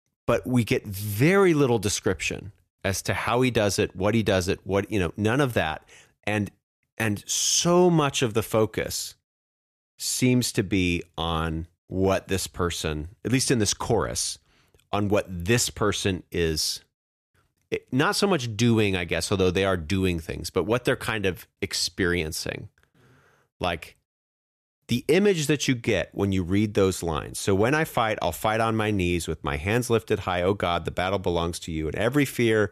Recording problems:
none

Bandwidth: 14.5 kHz